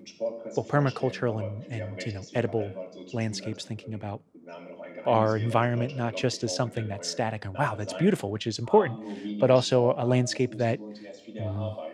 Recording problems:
voice in the background; noticeable; throughout; 10 dB below the speech

